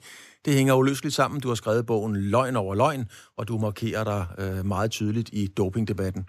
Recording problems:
none

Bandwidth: 14 kHz